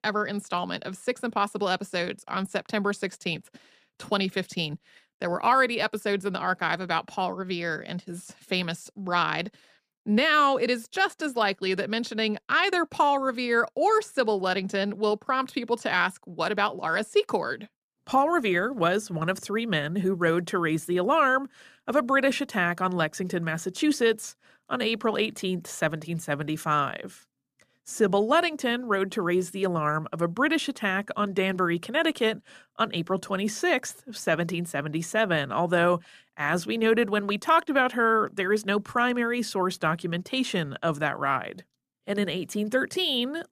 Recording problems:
none

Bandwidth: 14.5 kHz